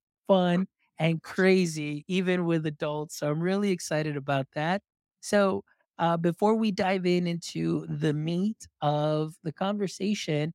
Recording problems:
none

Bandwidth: 16 kHz